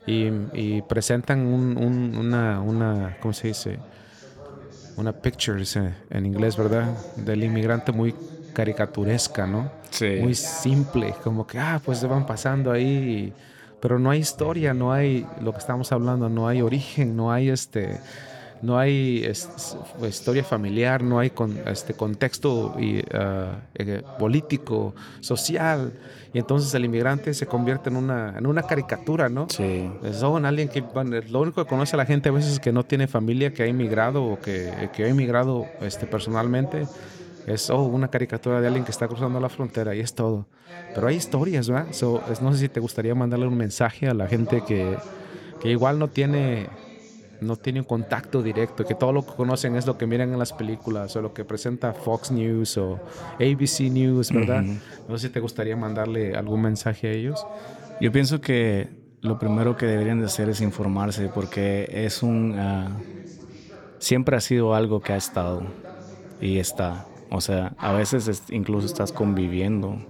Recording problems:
background chatter; noticeable; throughout; 3 voices, 15 dB below the speech

